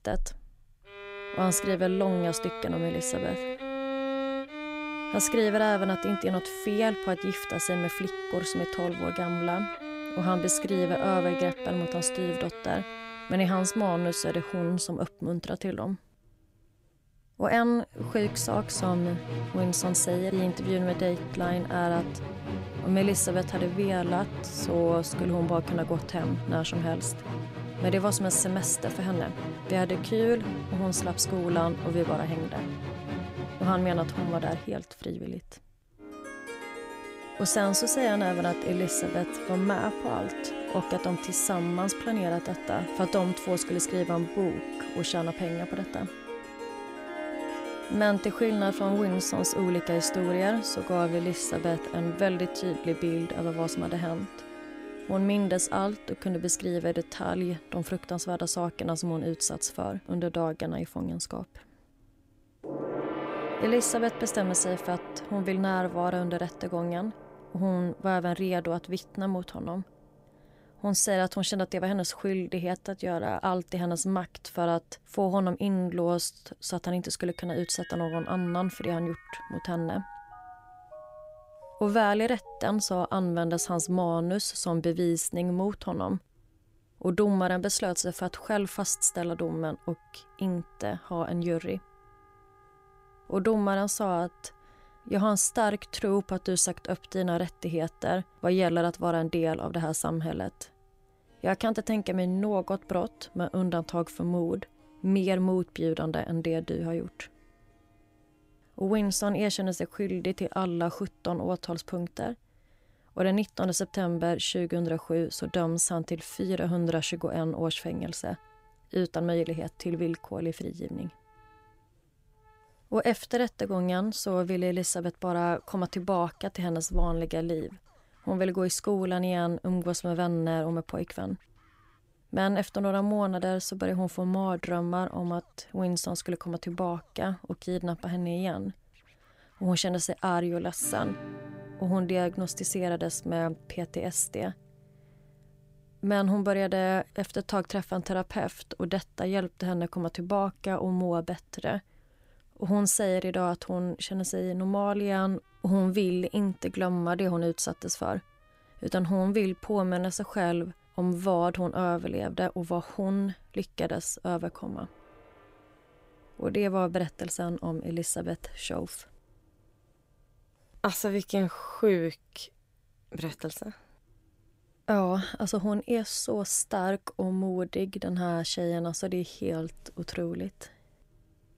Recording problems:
background music; loud; throughout; 8 dB below the speech

